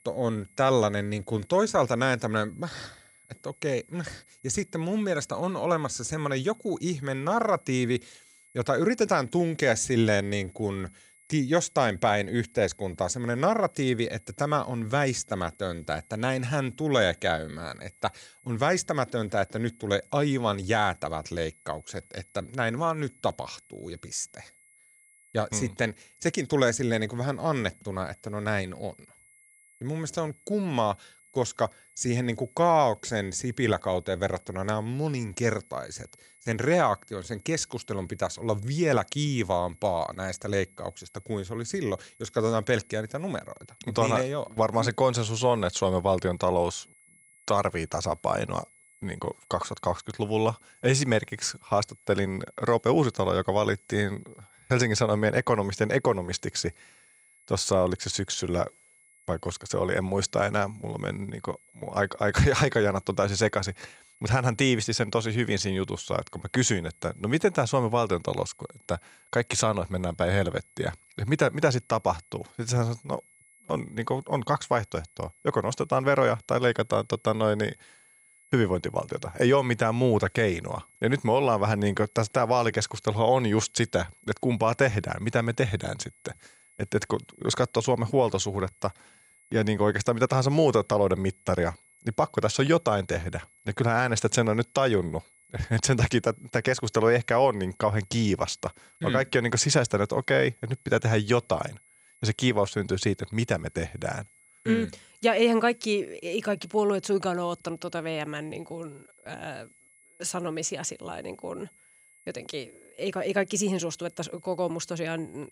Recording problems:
high-pitched whine; faint; throughout; 2 kHz, 30 dB below the speech

